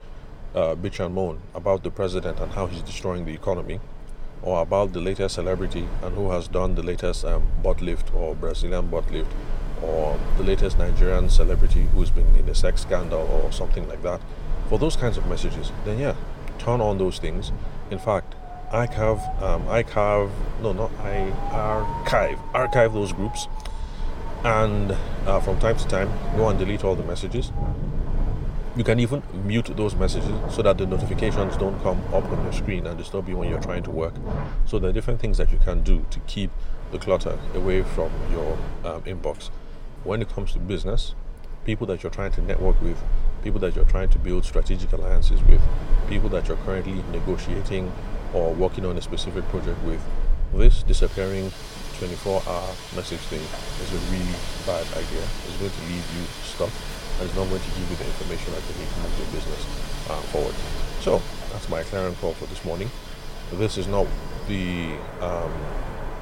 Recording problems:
wind in the background; loud; throughout; 3 dB below the speech

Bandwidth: 16.5 kHz